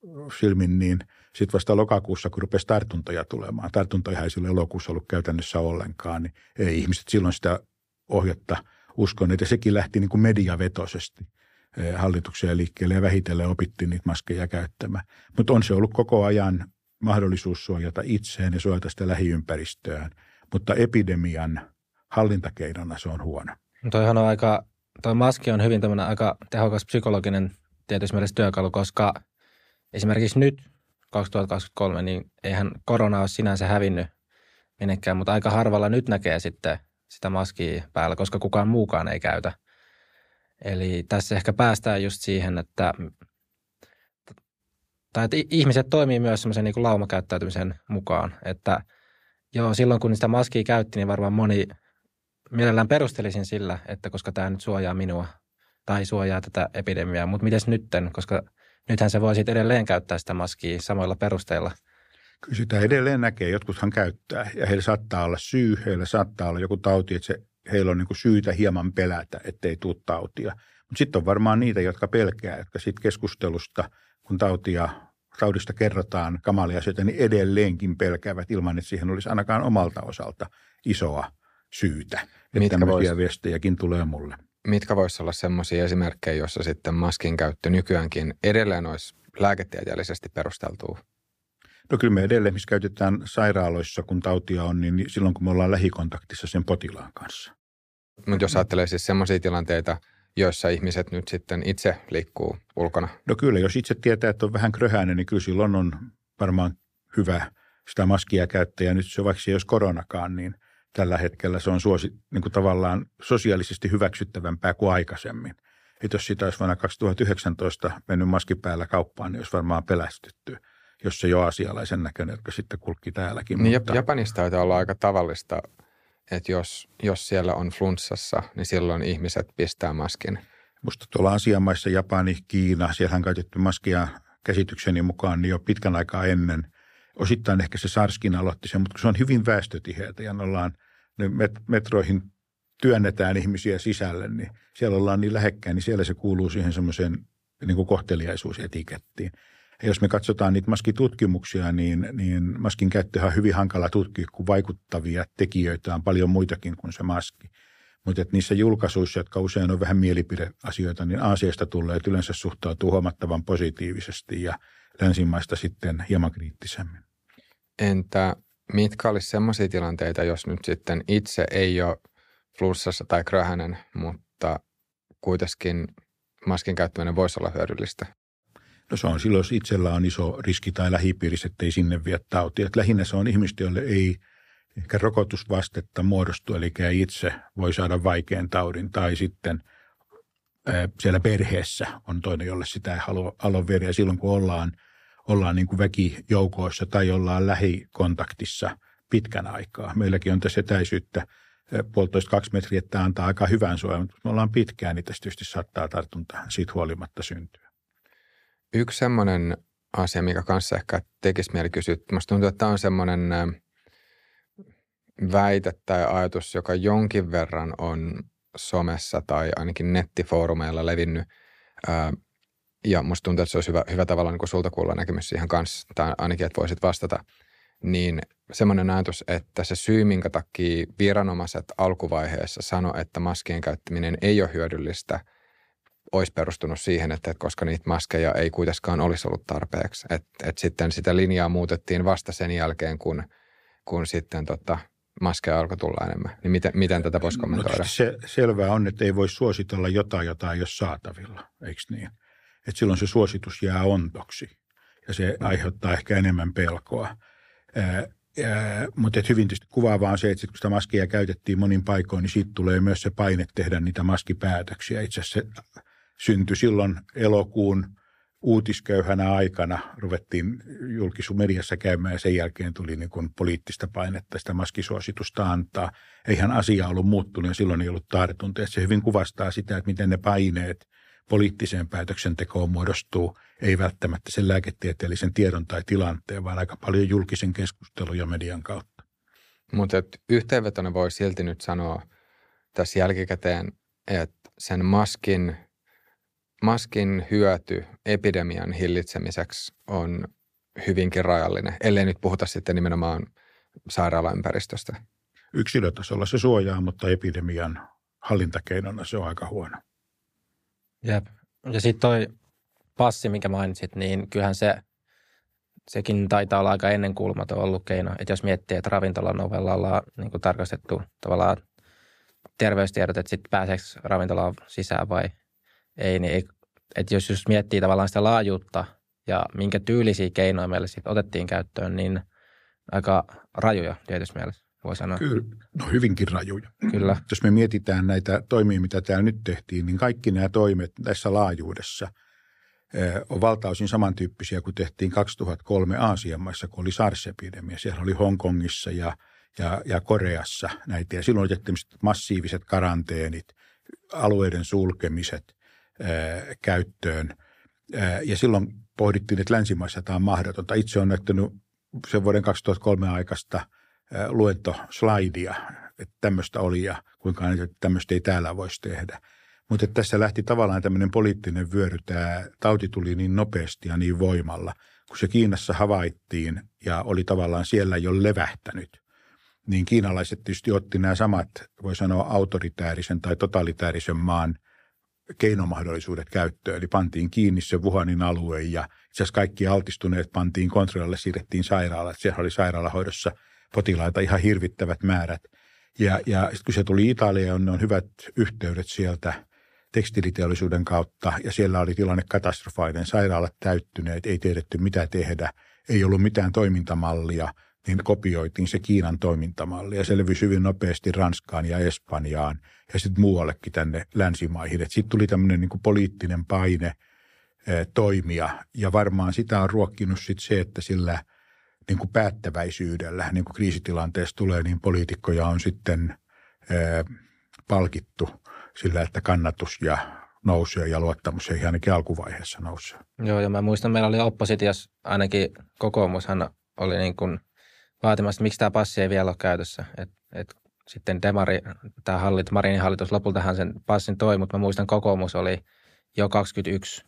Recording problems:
none

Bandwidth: 15 kHz